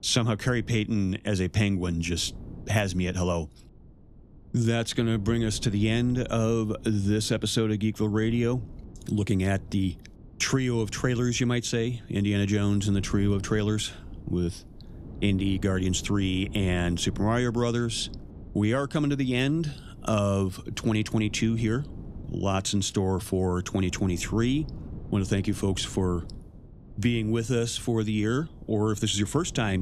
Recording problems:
wind noise on the microphone; occasional gusts; 20 dB below the speech
abrupt cut into speech; at the end

